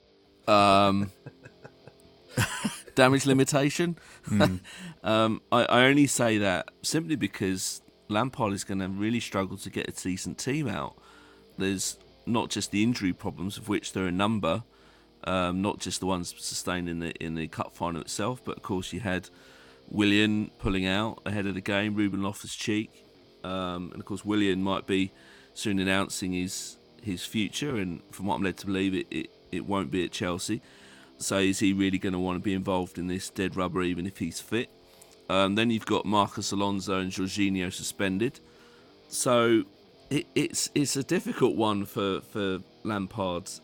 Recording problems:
background music; faint; throughout; 30 dB below the speech

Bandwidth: 17 kHz